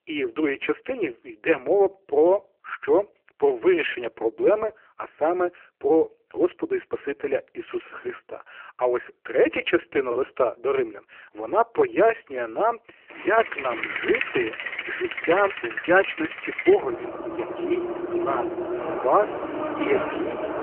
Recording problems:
phone-call audio; poor line; nothing above 3 kHz
traffic noise; loud; from 13 s on; 5 dB below the speech
choppy; occasionally; from 8 to 10 s; 2% of the speech affected

